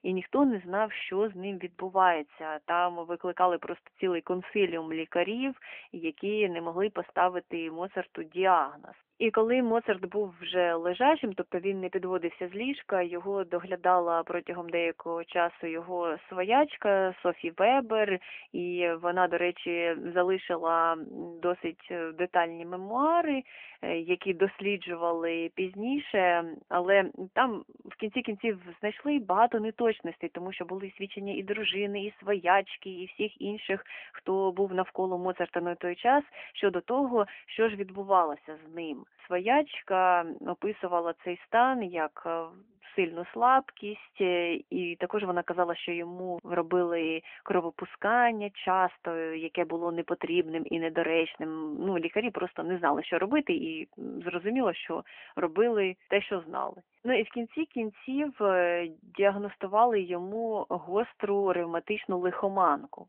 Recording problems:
phone-call audio; nothing above 3 kHz

